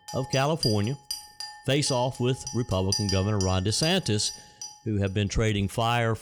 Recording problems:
household noises; loud; throughout; 8 dB below the speech

